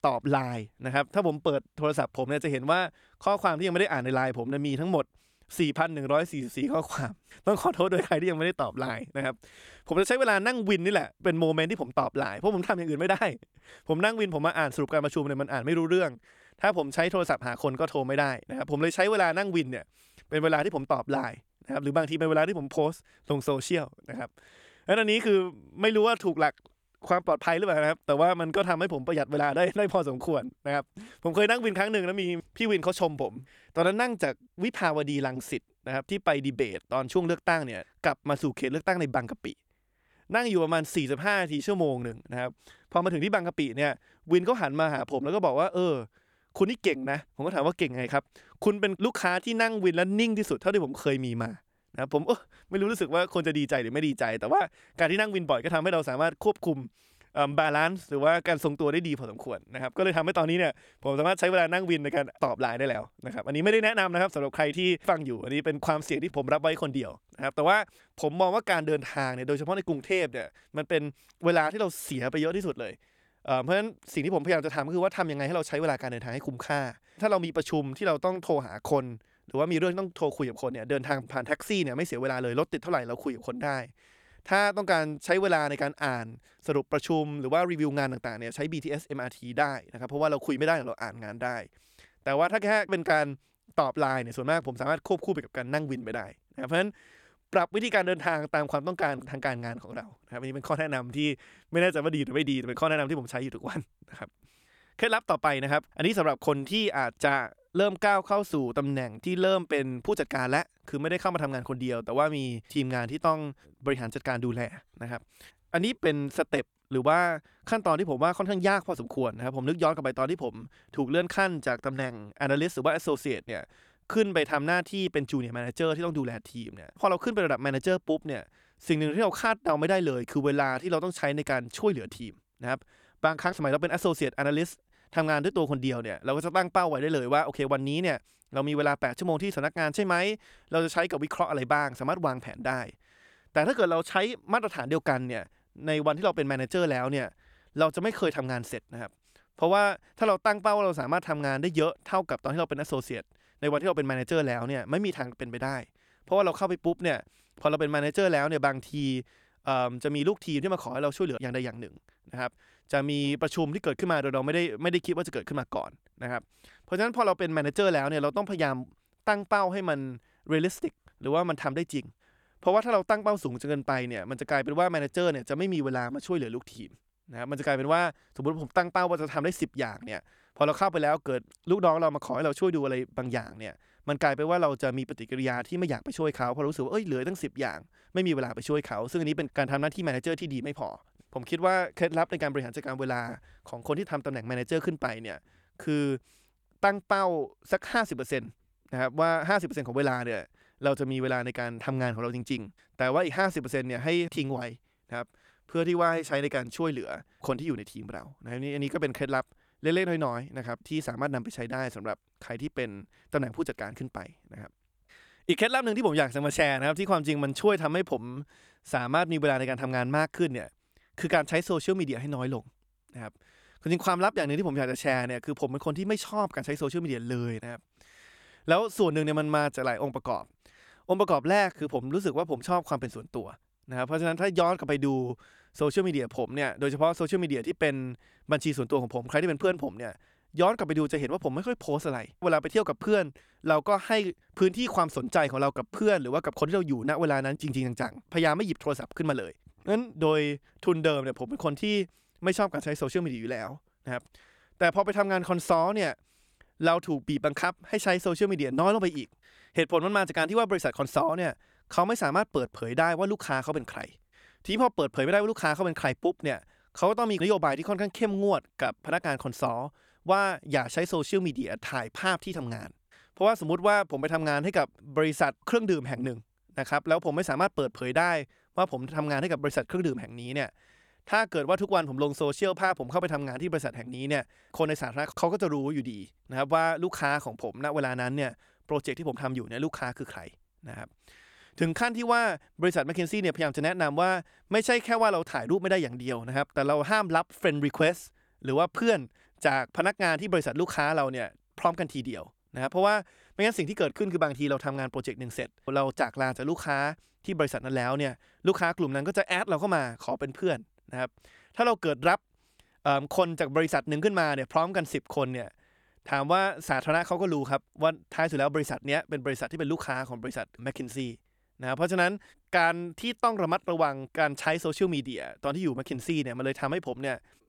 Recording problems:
none

